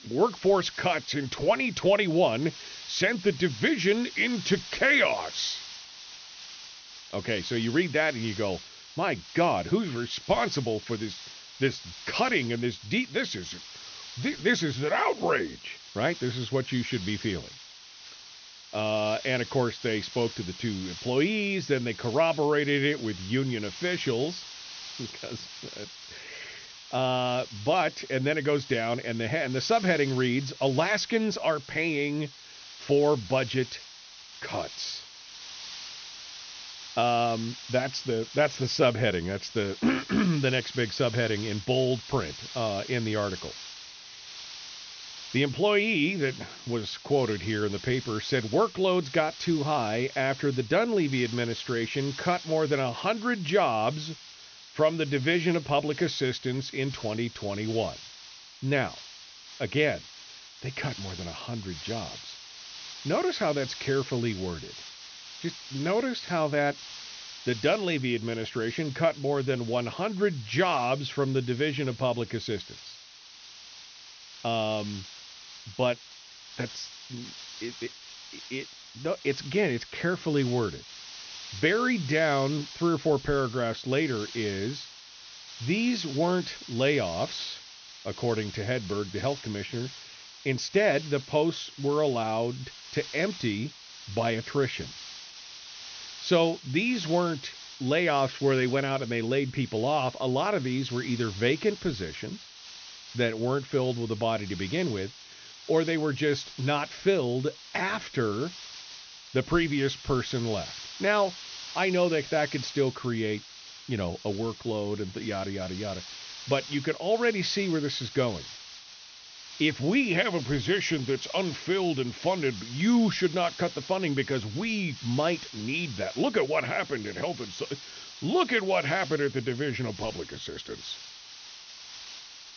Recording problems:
high frequencies cut off; noticeable; nothing above 6 kHz
hiss; noticeable; throughout; 15 dB below the speech

